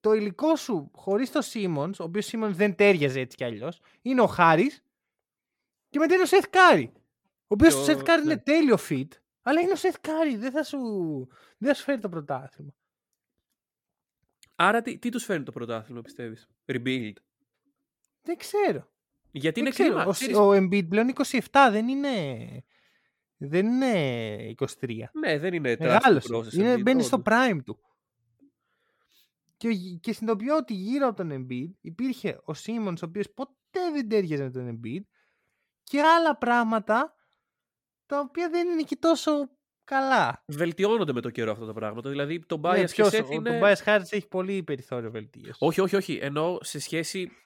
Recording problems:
none

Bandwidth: 17 kHz